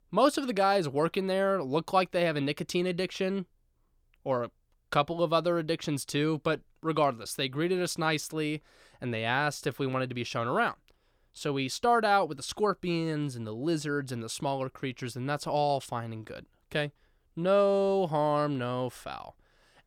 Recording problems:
none

